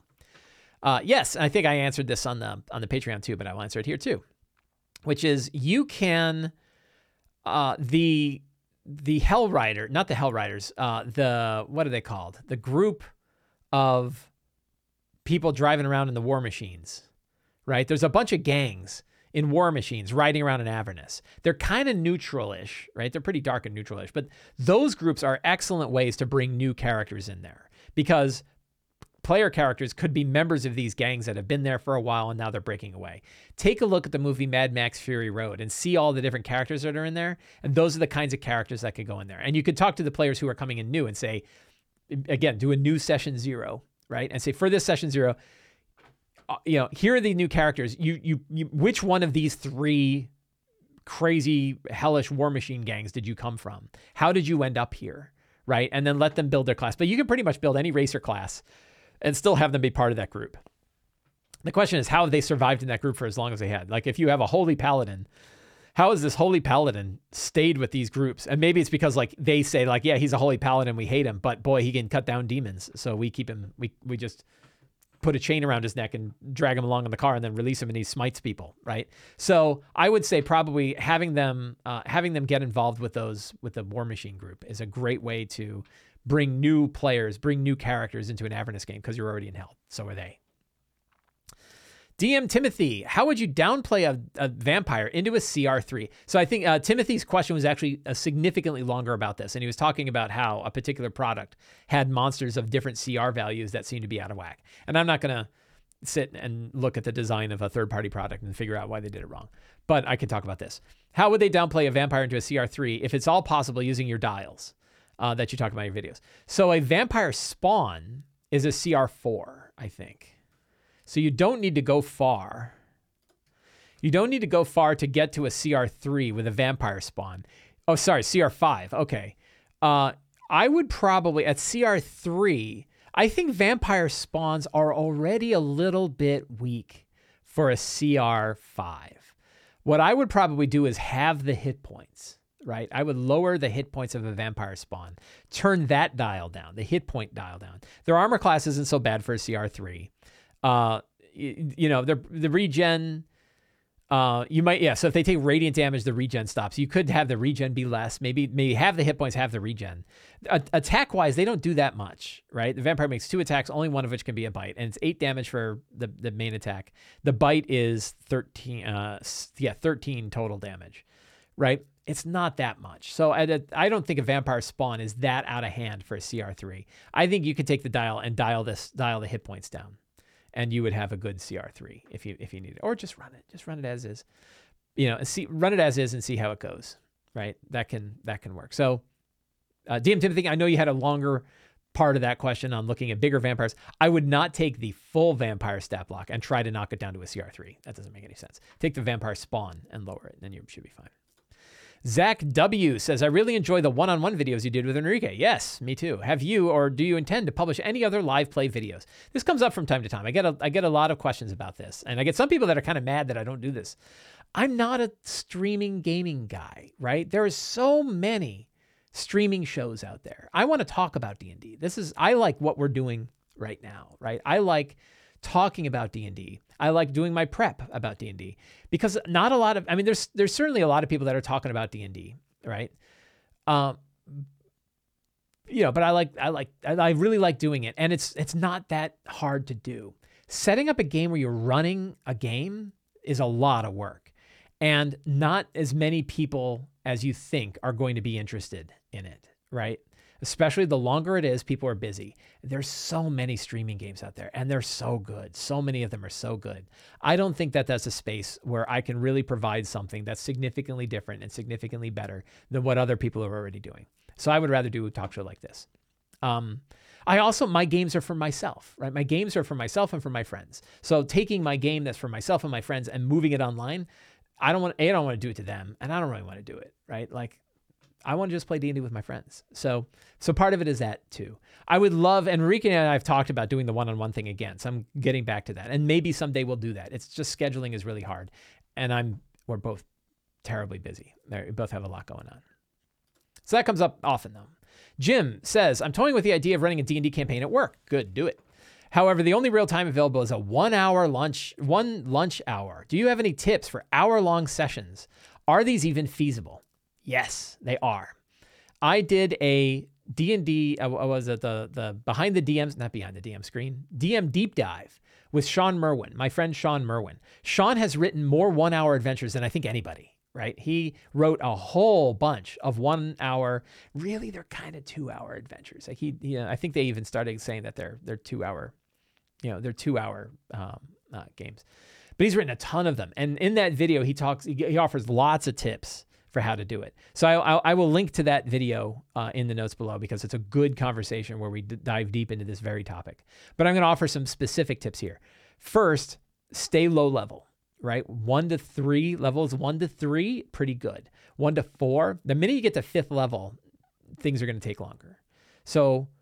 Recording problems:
none

